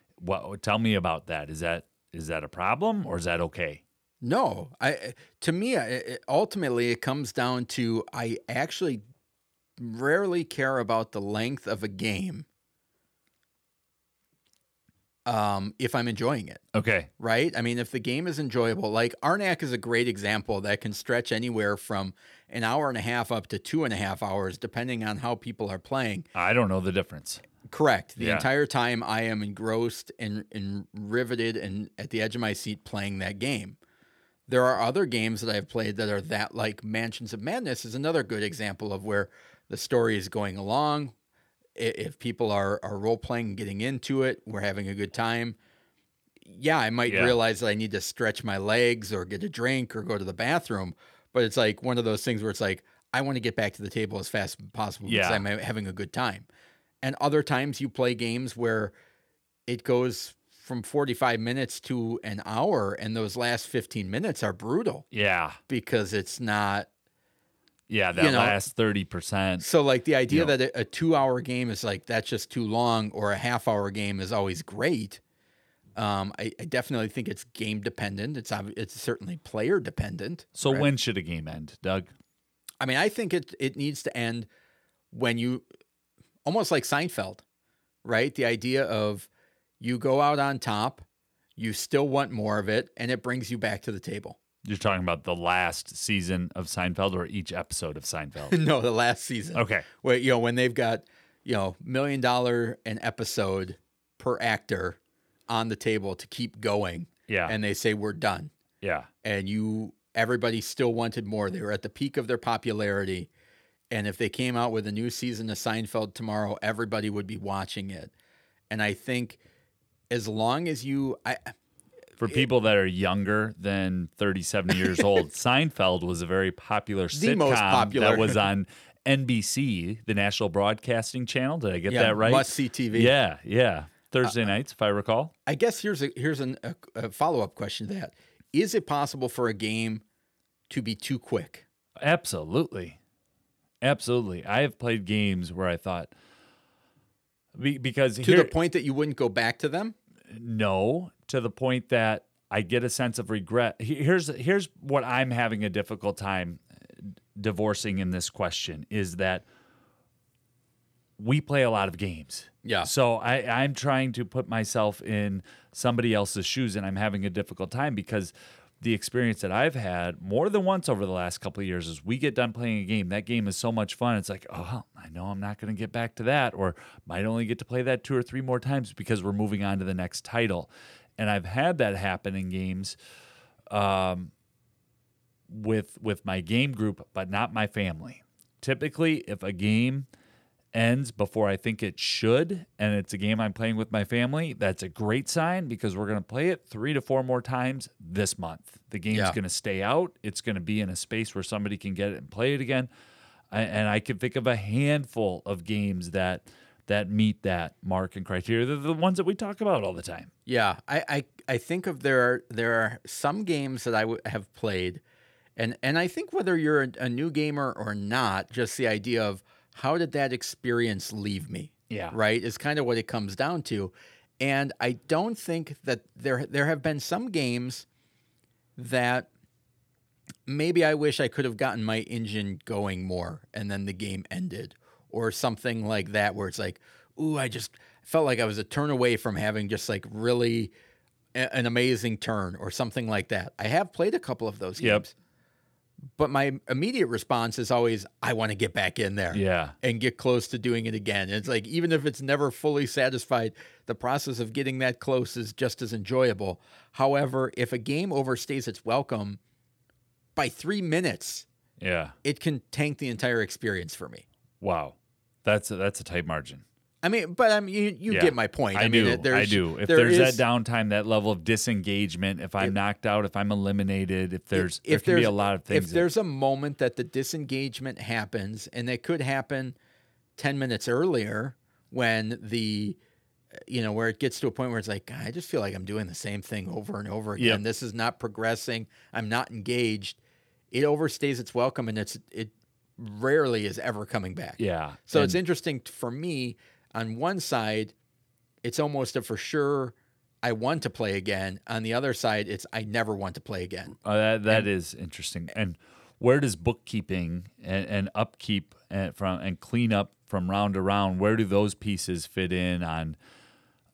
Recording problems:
none

